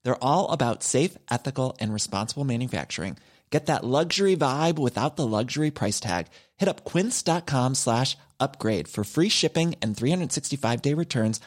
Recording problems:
none

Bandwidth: 16 kHz